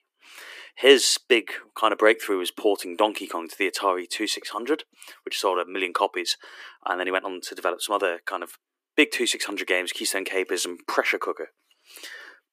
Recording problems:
thin; very; fading below 300 Hz

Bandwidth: 15 kHz